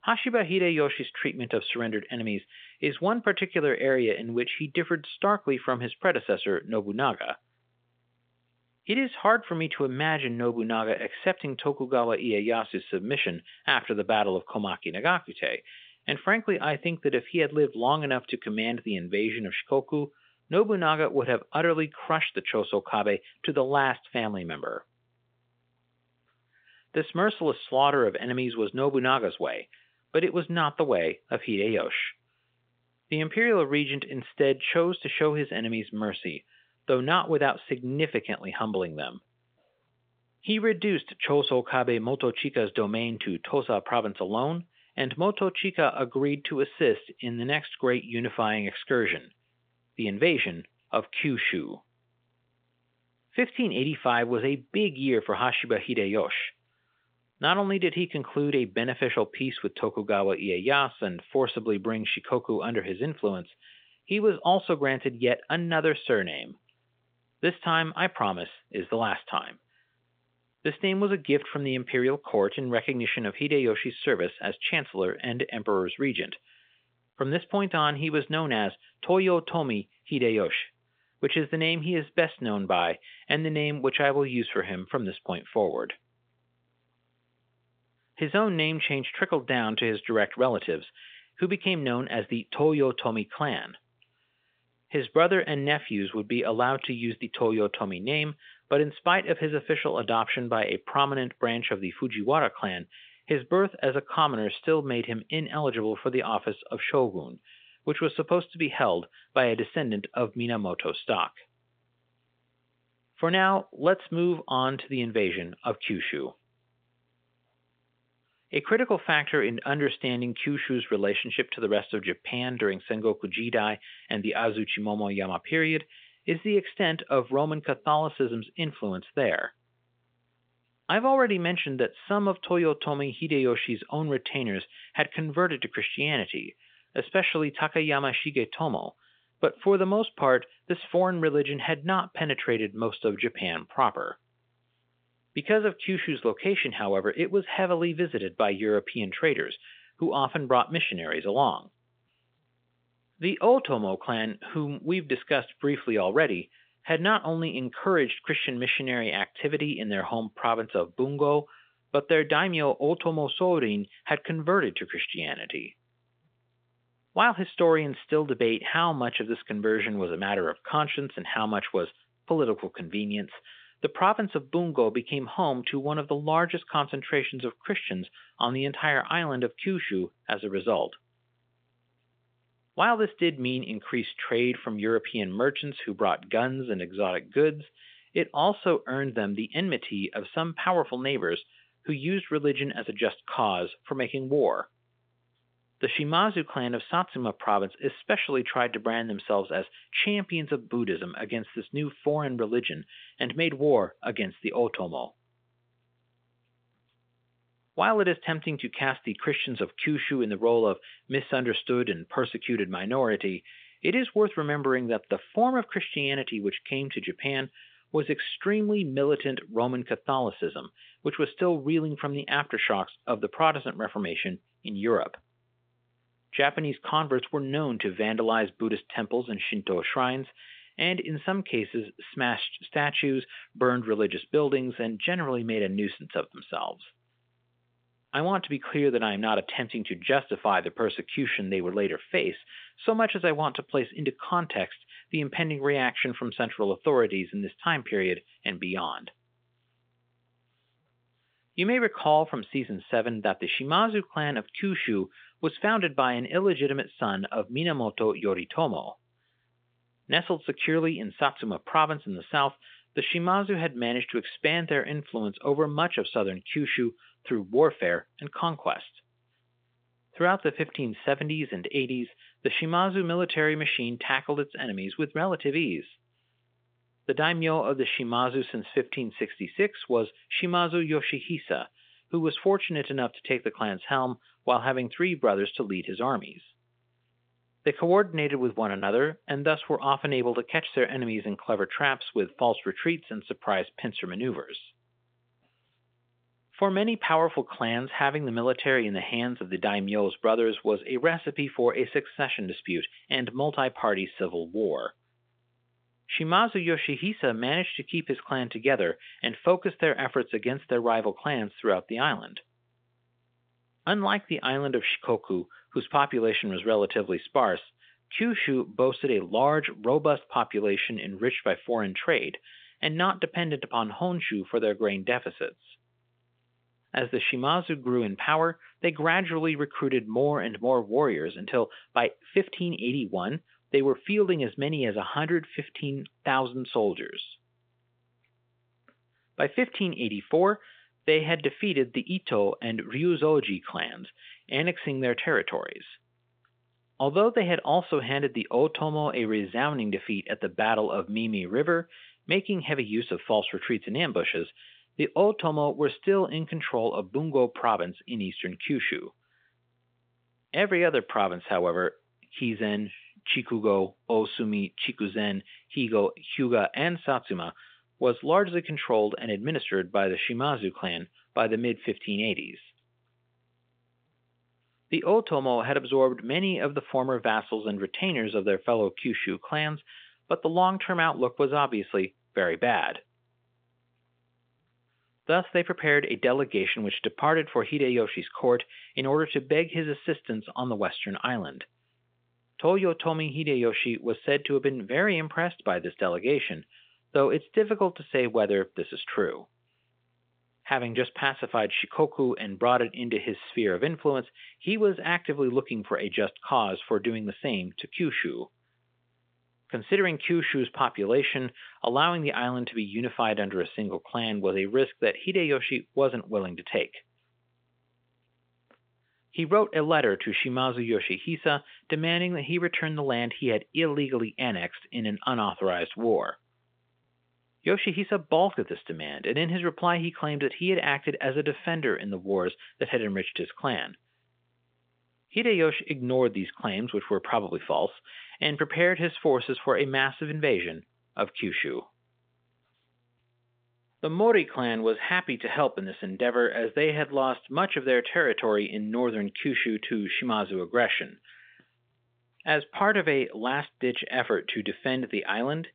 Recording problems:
phone-call audio

